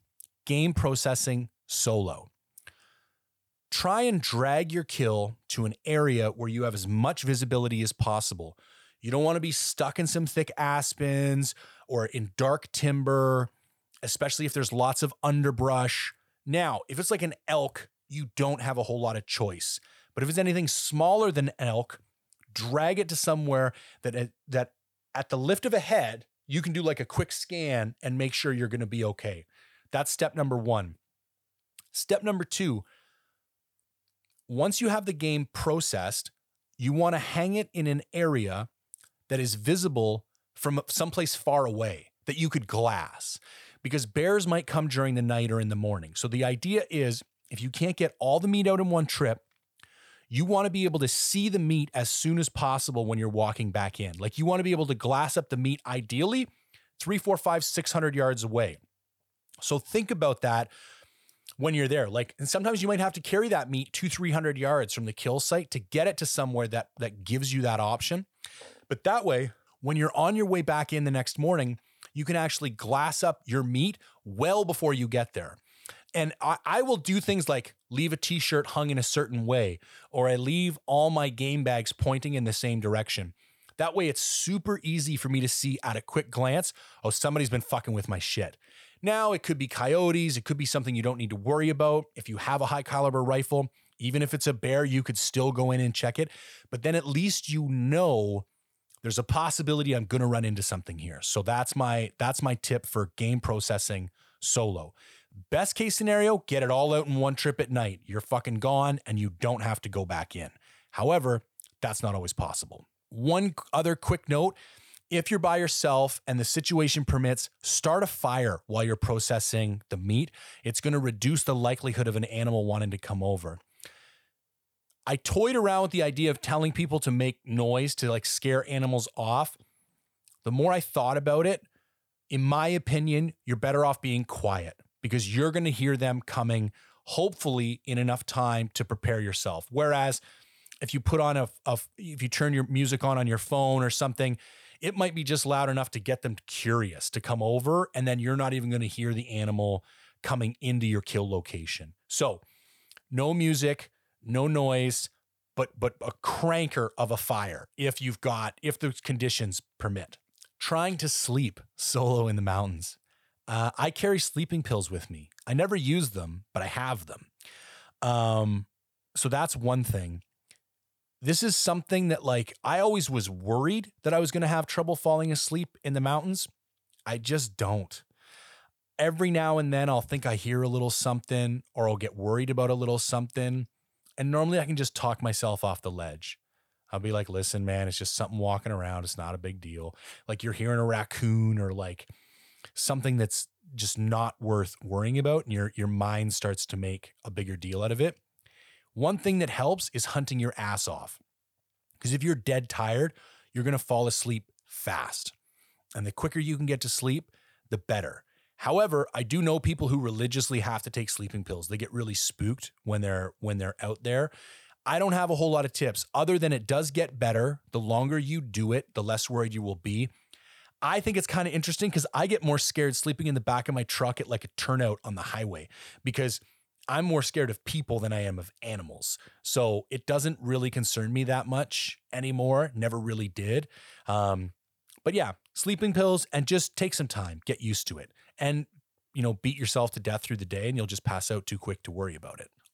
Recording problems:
none

